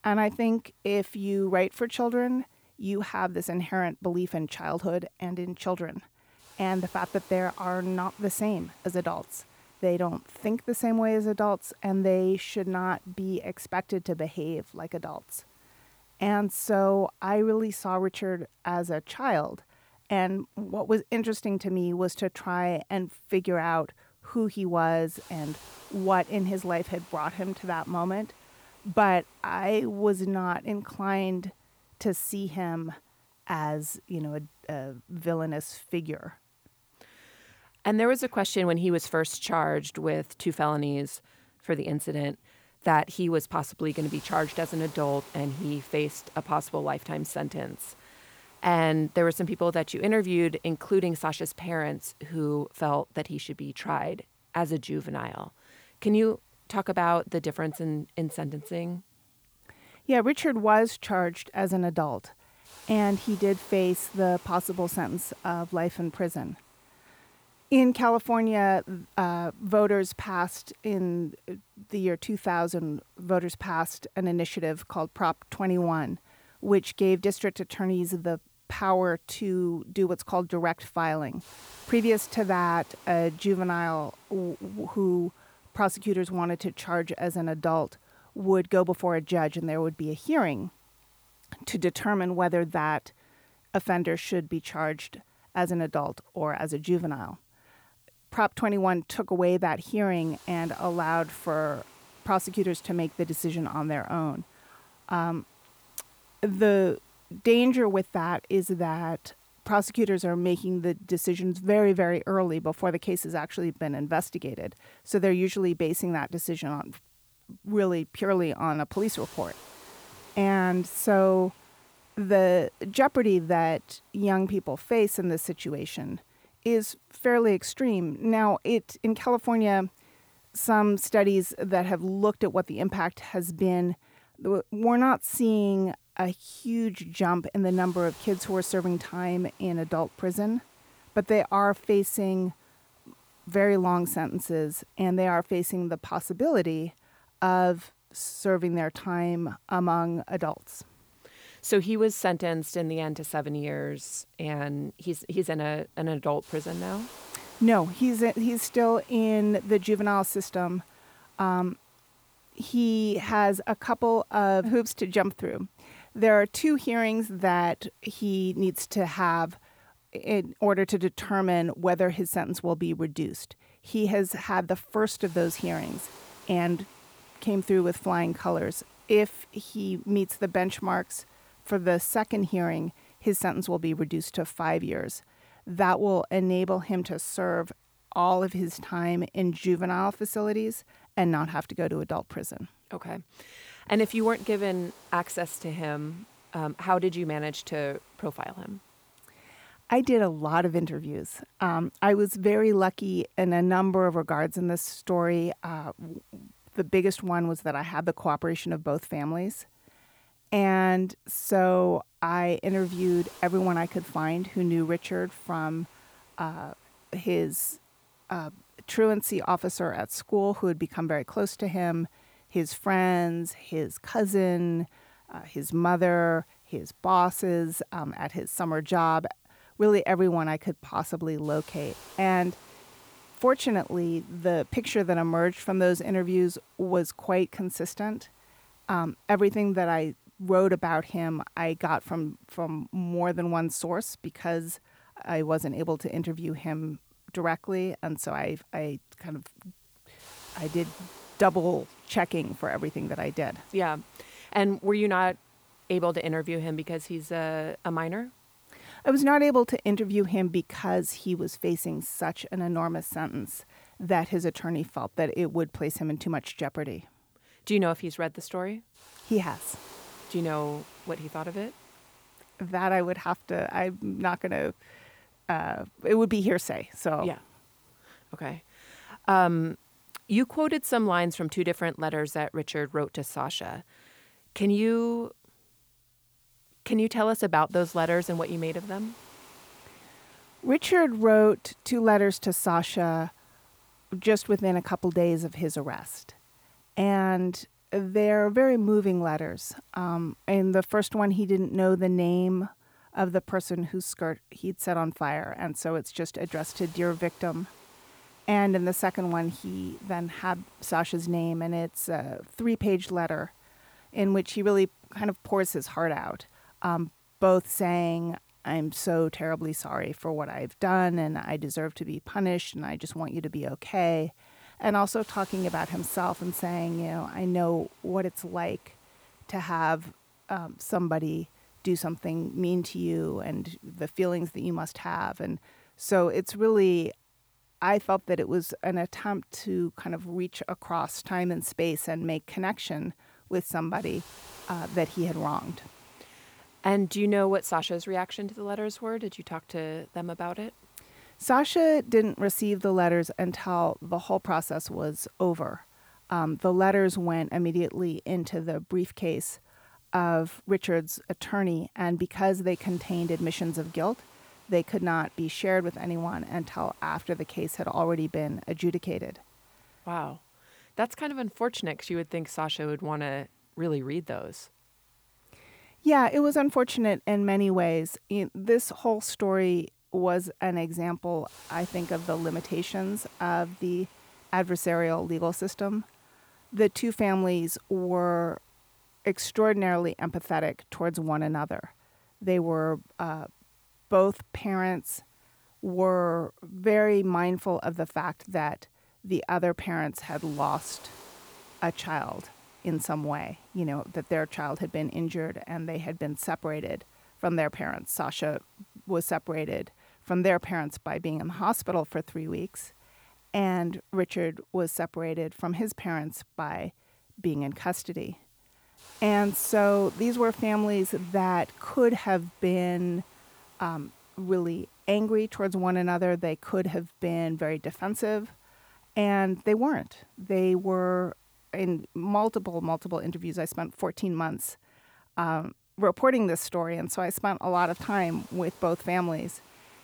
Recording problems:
hiss; faint; throughout; 25 dB below the speech

